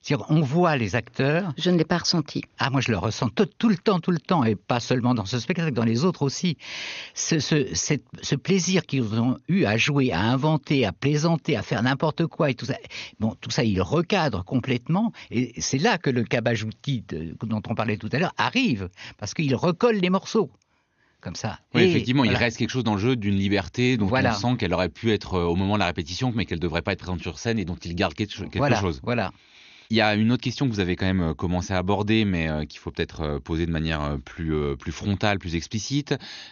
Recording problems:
garbled, watery; slightly; nothing above 6.5 kHz

